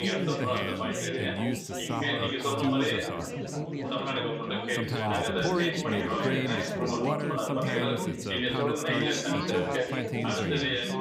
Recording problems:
chatter from many people; very loud; throughout; 4 dB above the speech

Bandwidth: 15.5 kHz